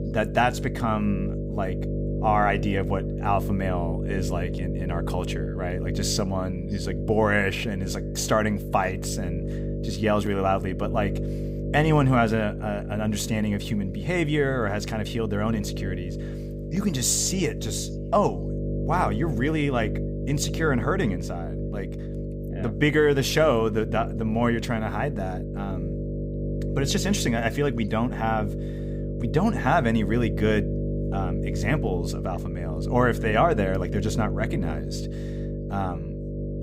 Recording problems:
electrical hum; noticeable; throughout; 50 Hz, 10 dB below the speech

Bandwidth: 15.5 kHz